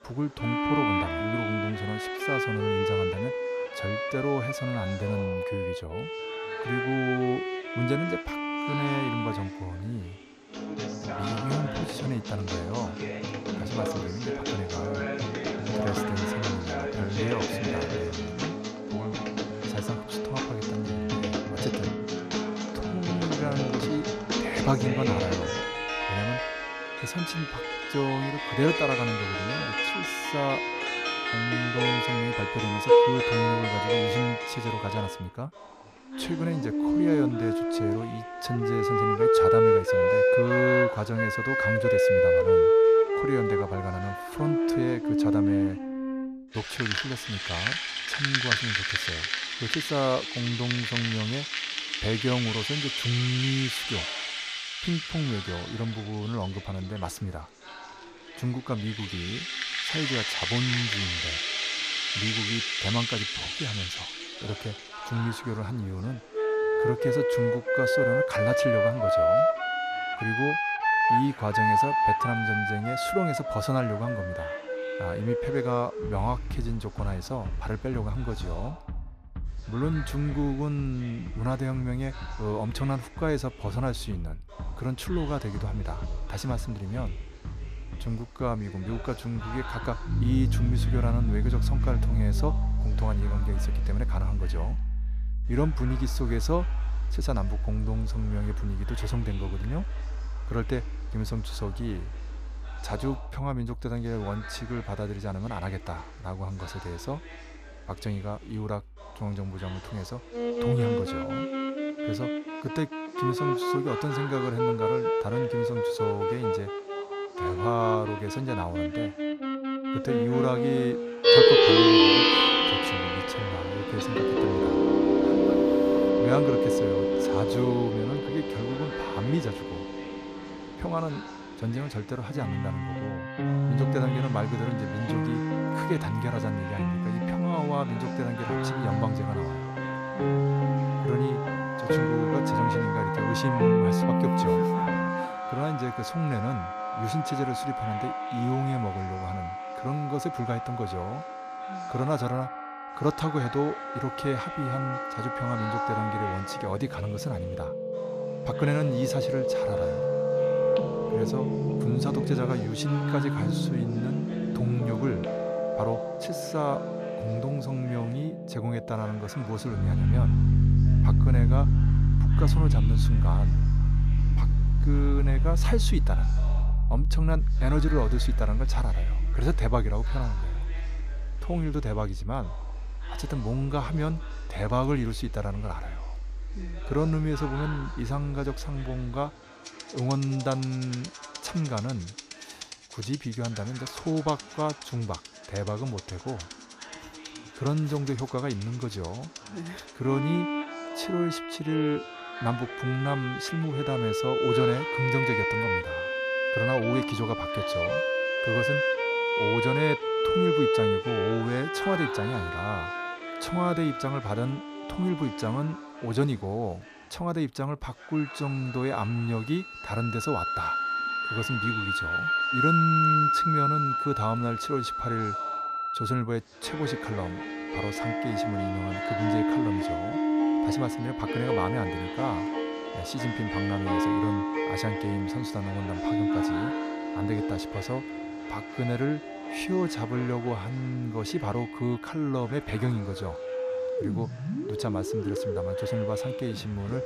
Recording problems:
background music; very loud; throughout; 4 dB above the speech
voice in the background; noticeable; throughout; 15 dB below the speech

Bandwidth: 14.5 kHz